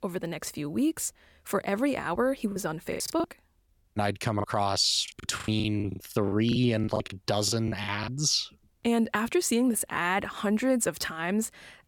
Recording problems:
choppy; very; at 2.5 s and from 4.5 to 8 s; 20% of the speech affected

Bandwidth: 17.5 kHz